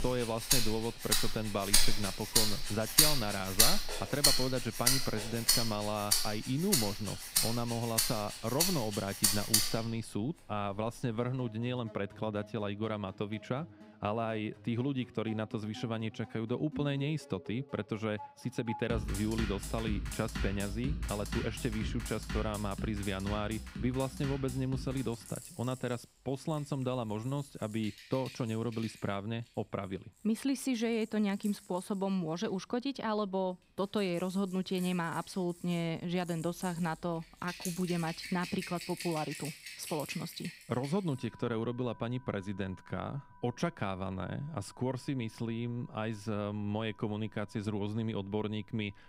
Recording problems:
background music; very loud; throughout; 3 dB above the speech

